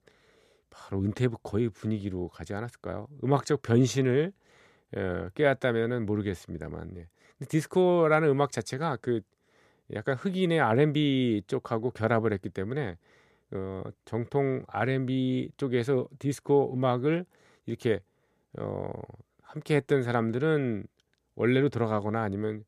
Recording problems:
none

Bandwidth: 14.5 kHz